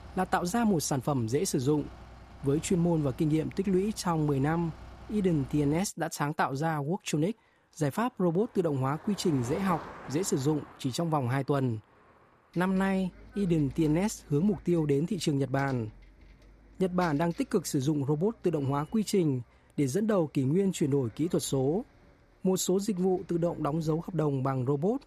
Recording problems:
traffic noise; faint; throughout; 20 dB below the speech

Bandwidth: 14.5 kHz